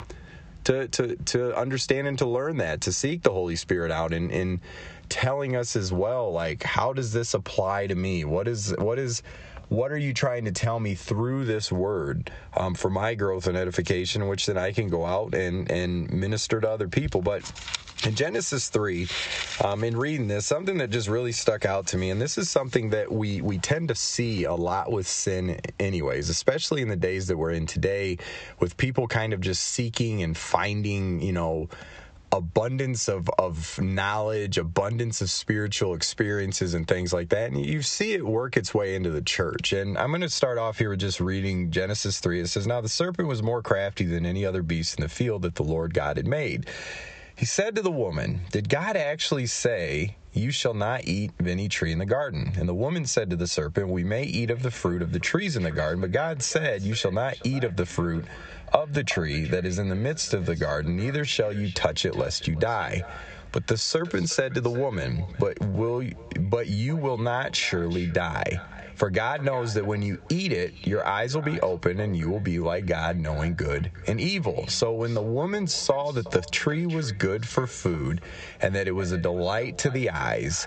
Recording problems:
squashed, flat; heavily
high frequencies cut off; noticeable; nothing above 8 kHz
echo of what is said; faint; from 55 s on; 370 ms later, 20 dB below the speech

